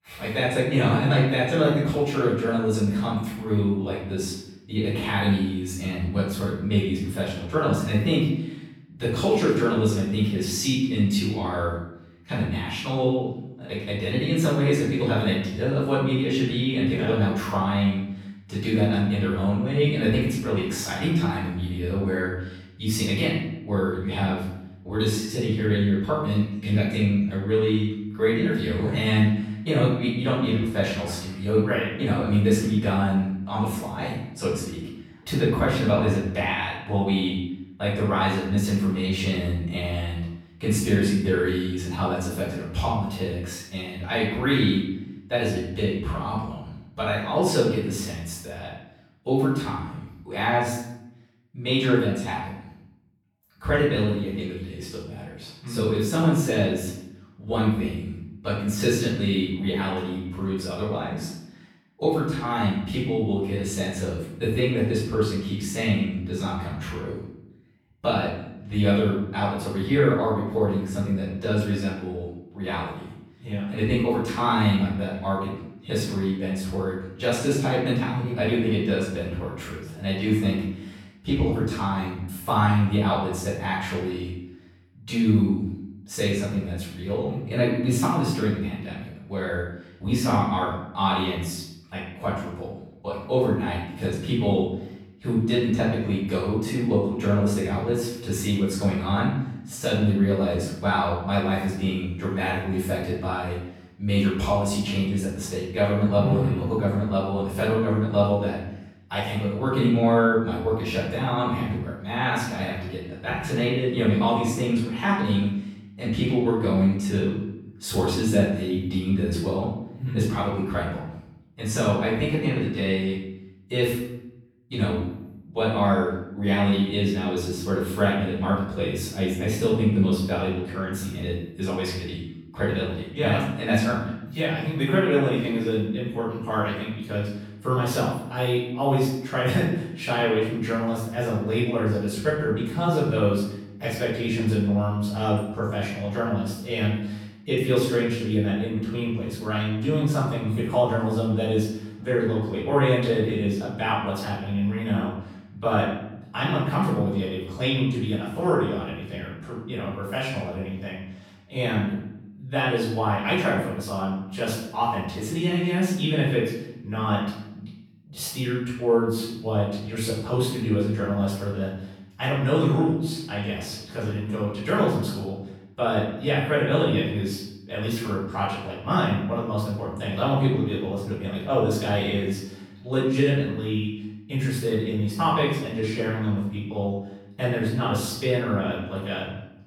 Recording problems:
off-mic speech; far
room echo; noticeable; dies away in 0.7 s

